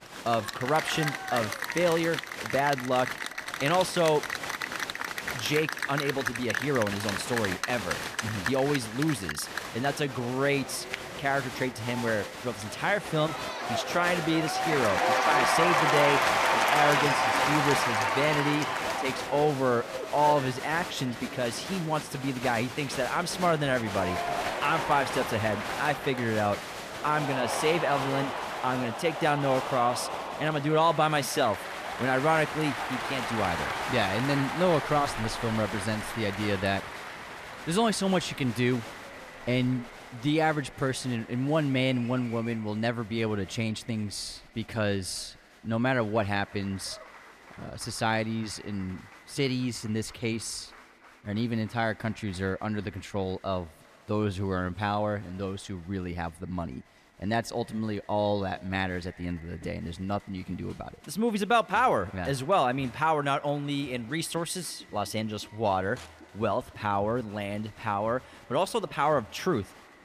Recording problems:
echo of what is said; faint; throughout; 130 ms later, 25 dB below the speech
crowd noise; loud; throughout; 2 dB below the speech

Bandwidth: 14.5 kHz